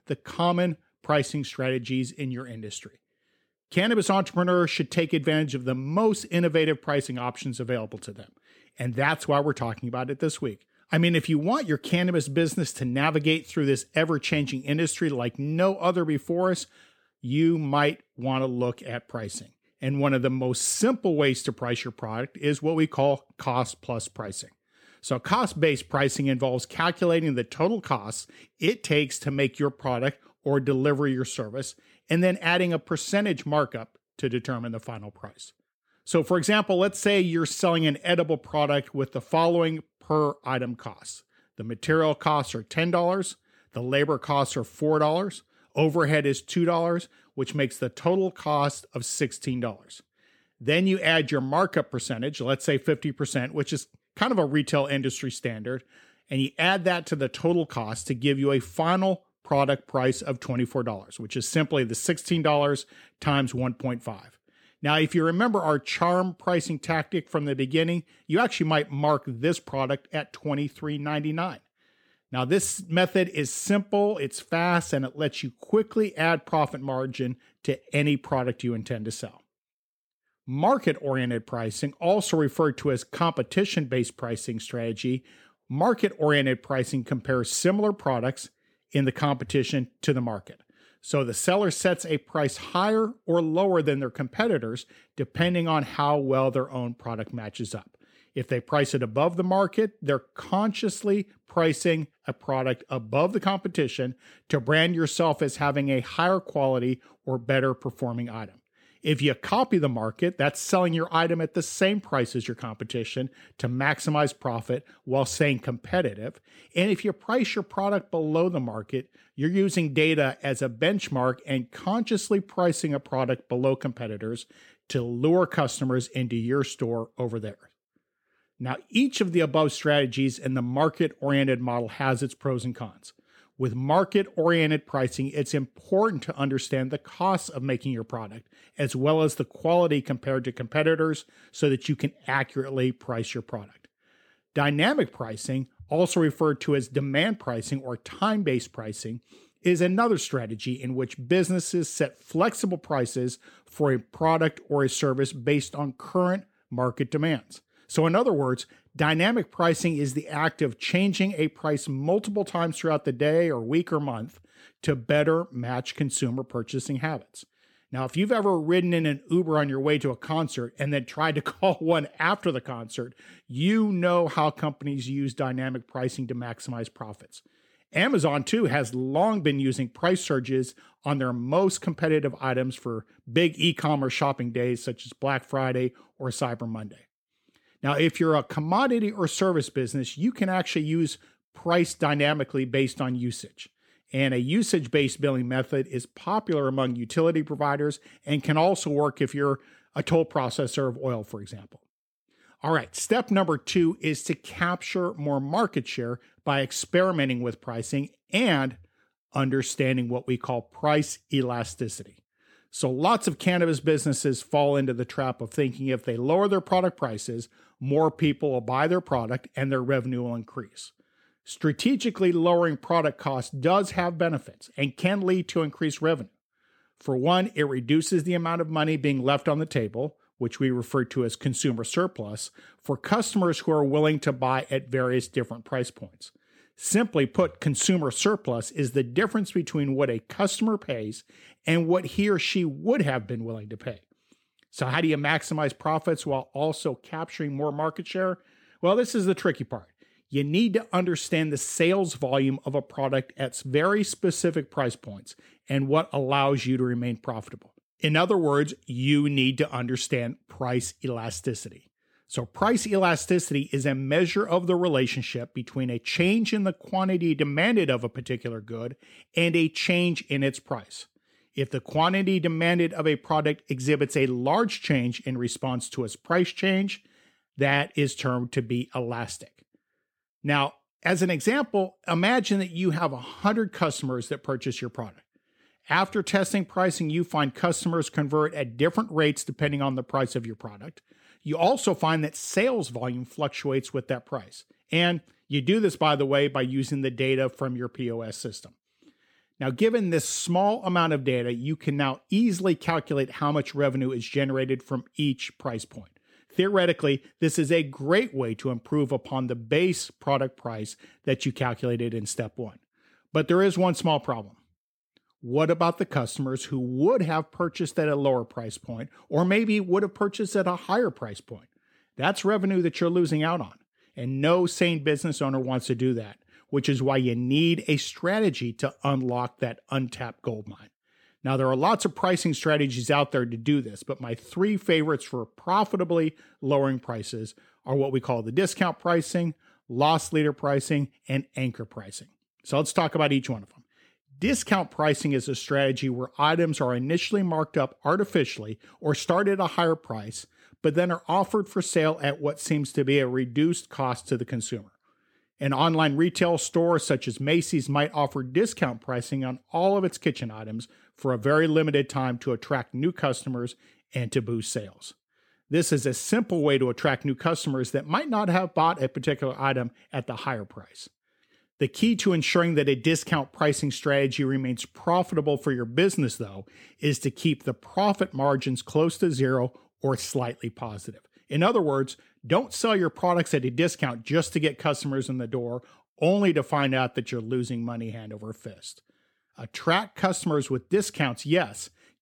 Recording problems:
none

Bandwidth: 18 kHz